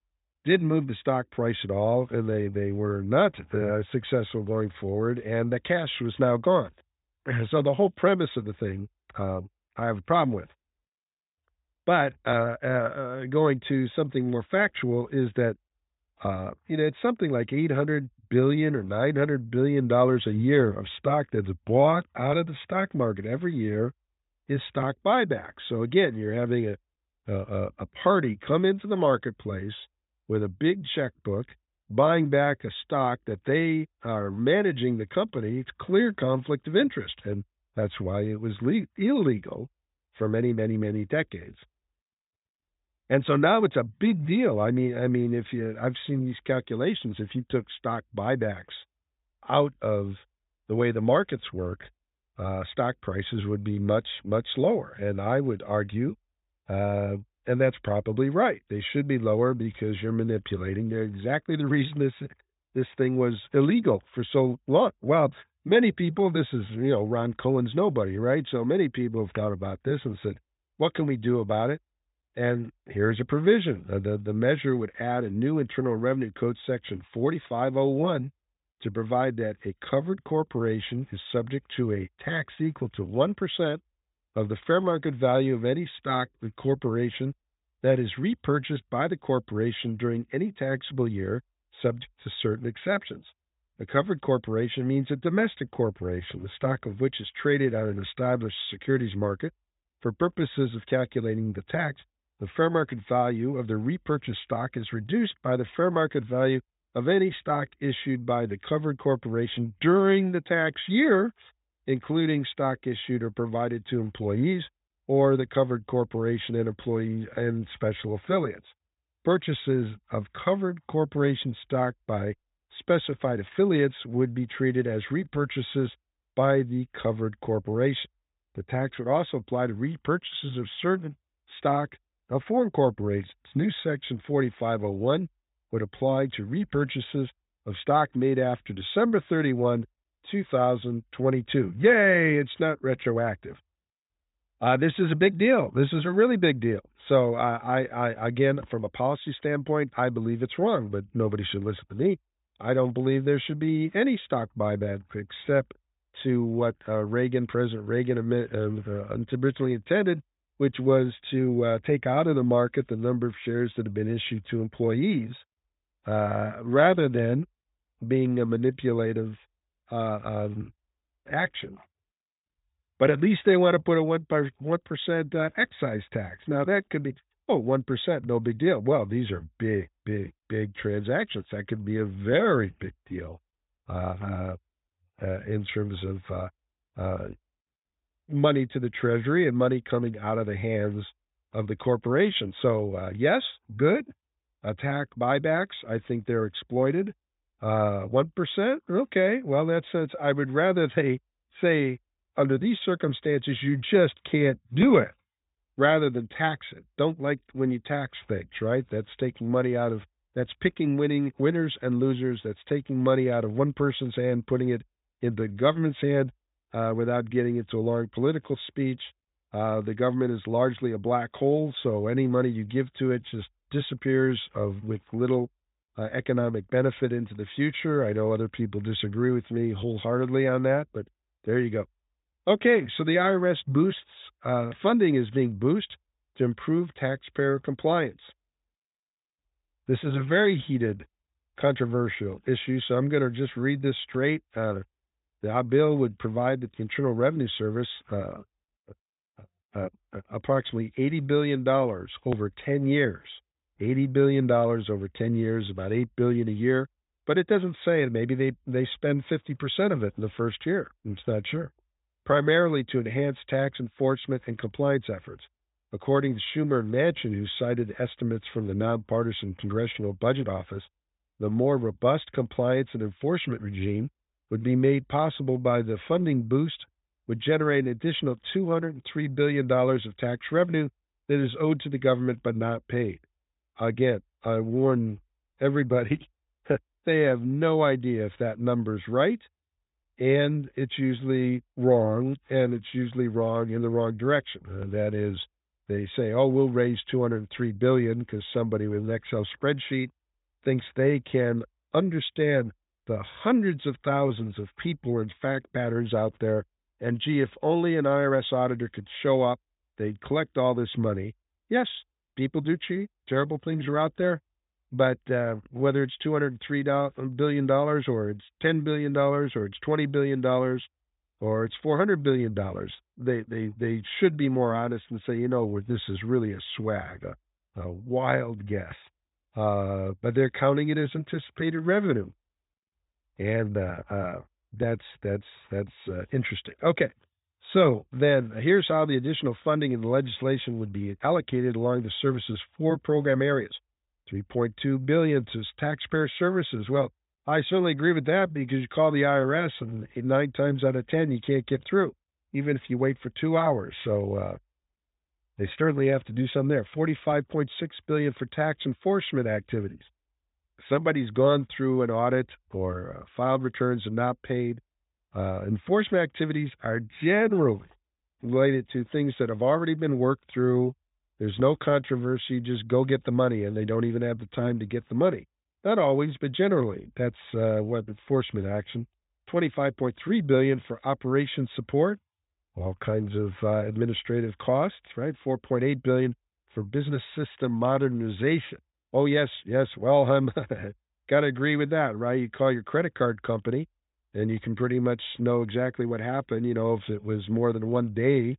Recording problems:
high frequencies cut off; severe; nothing above 4 kHz

